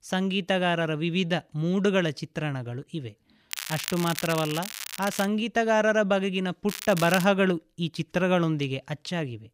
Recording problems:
crackling; loud; from 3.5 to 5.5 s and at 6.5 s; 9 dB below the speech

